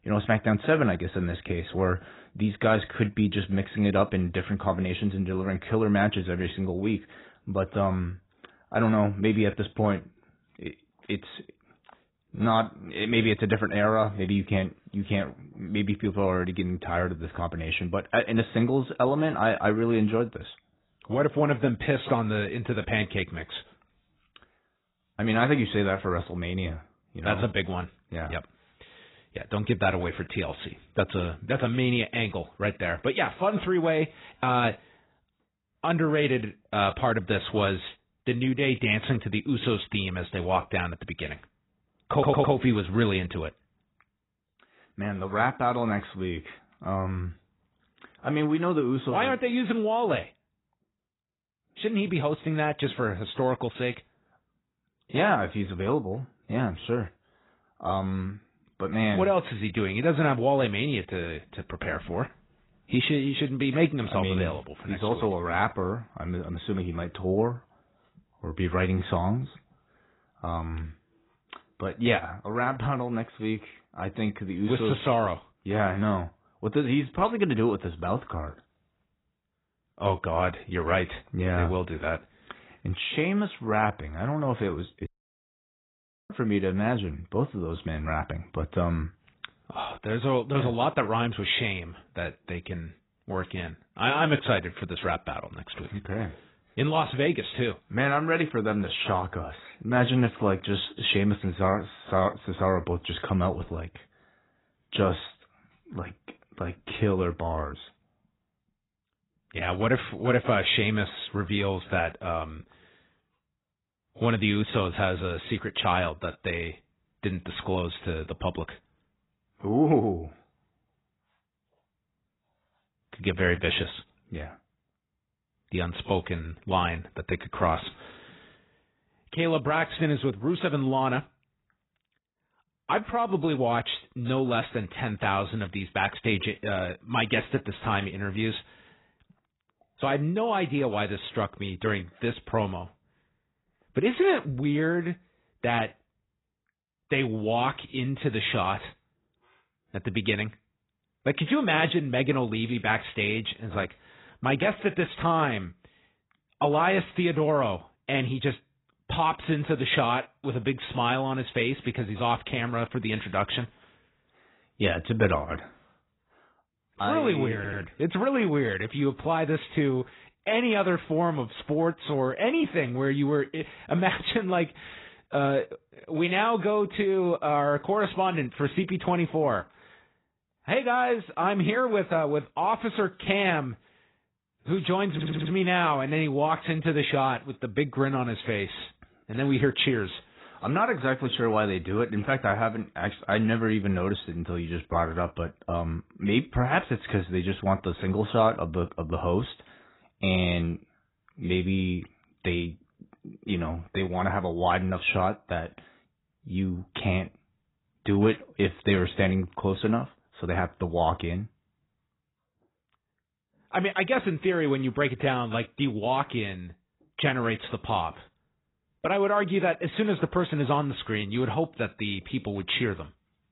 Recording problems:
garbled, watery; badly; nothing above 4 kHz
audio stuttering; at 42 s, at 2:48 and at 3:05
audio cutting out; at 1:25 for 1 s

